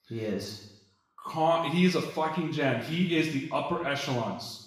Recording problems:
room echo; noticeable; dies away in 0.8 s
off-mic speech; somewhat distant

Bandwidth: 15 kHz